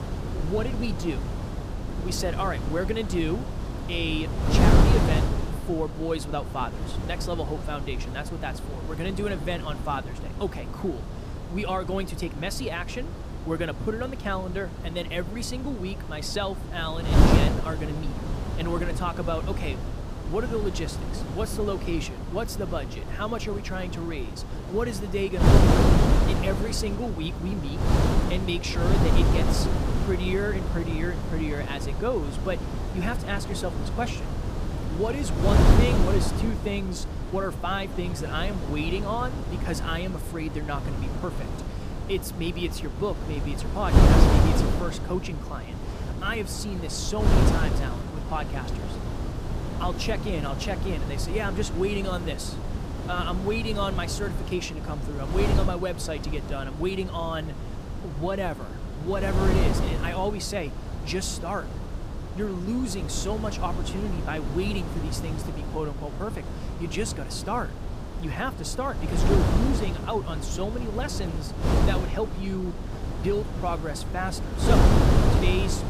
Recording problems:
wind noise on the microphone; heavy; 2 dB below the speech

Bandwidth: 15 kHz